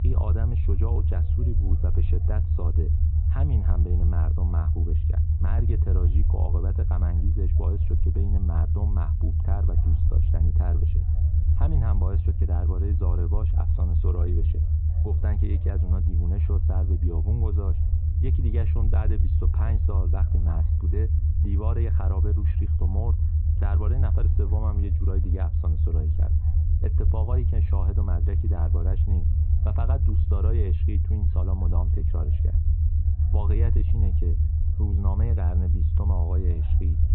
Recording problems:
high frequencies cut off; severe; nothing above 4 kHz
muffled; very slightly; fading above 3 kHz
low rumble; loud; throughout; 1 dB below the speech
background chatter; faint; throughout; 4 voices, 25 dB below the speech

